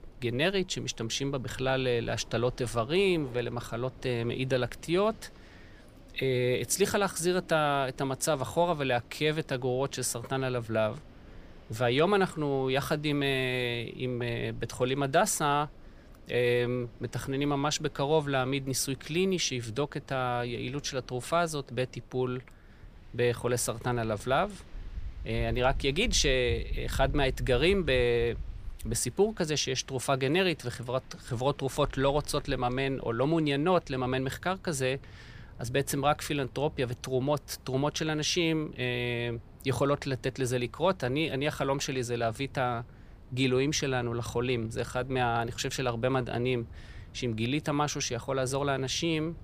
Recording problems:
wind in the background; noticeable; throughout; 20 dB below the speech

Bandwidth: 15 kHz